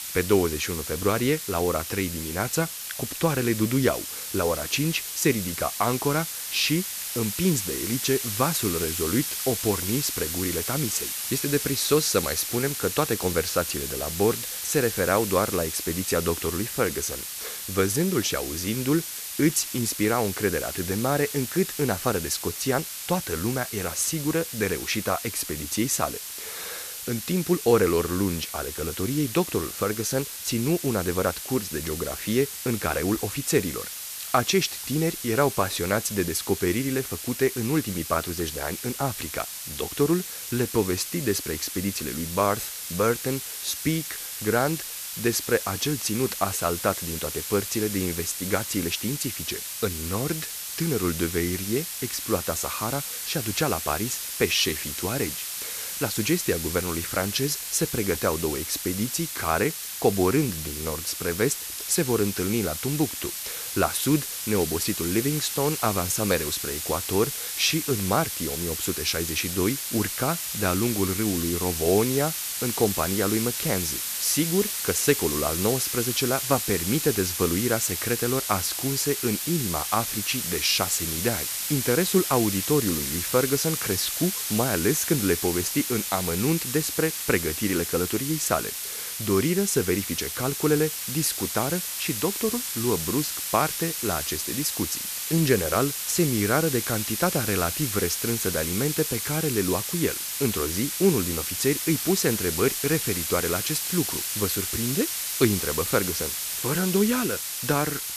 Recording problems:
hiss; loud; throughout; 3 dB below the speech

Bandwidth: 14.5 kHz